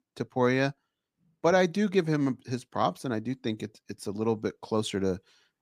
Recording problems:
none

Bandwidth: 15 kHz